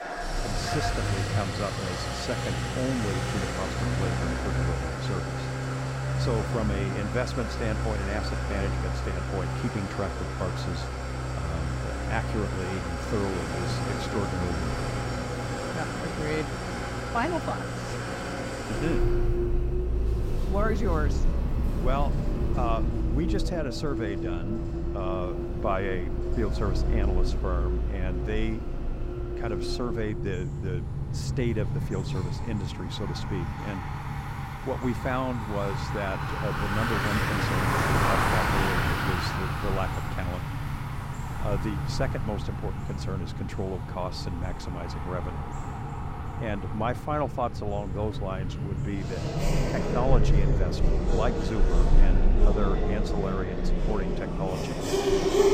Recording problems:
traffic noise; very loud; throughout; 4 dB above the speech

